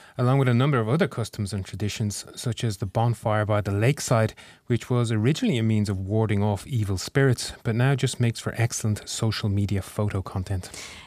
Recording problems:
none

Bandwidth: 15 kHz